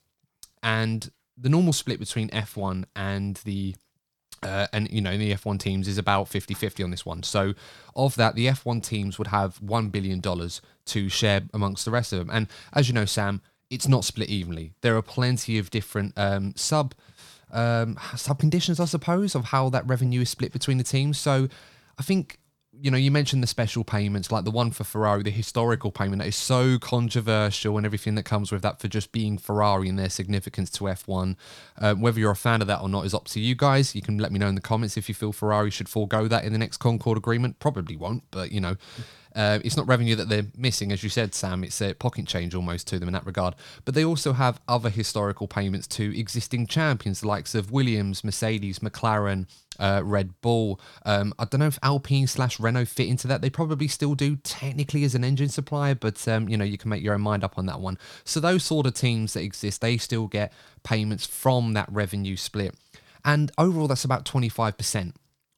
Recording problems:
none

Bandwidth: 18.5 kHz